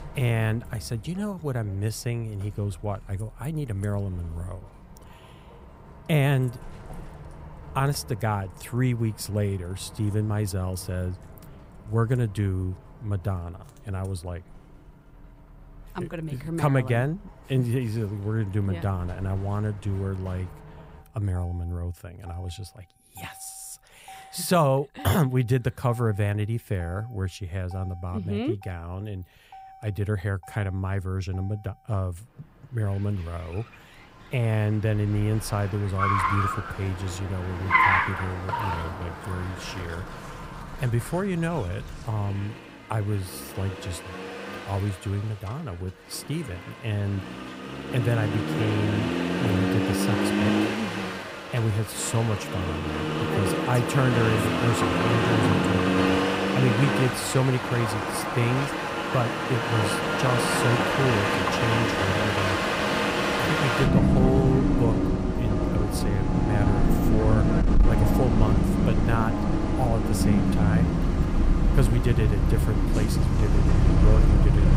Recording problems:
traffic noise; very loud; throughout; 3 dB above the speech

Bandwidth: 15.5 kHz